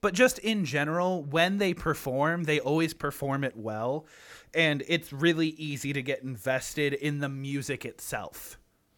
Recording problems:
none

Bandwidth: 18 kHz